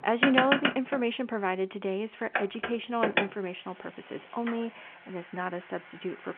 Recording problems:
phone-call audio; nothing above 3.5 kHz
traffic noise; very loud; throughout; 1 dB above the speech

